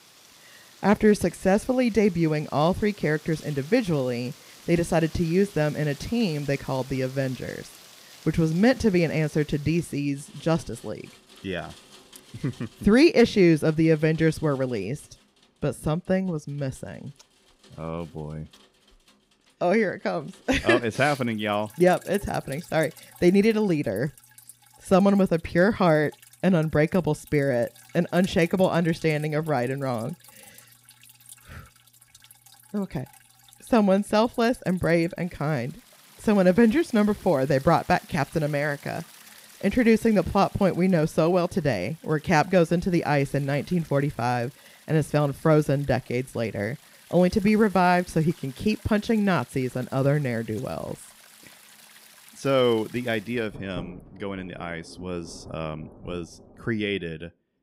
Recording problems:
rain or running water; faint; throughout; 25 dB below the speech

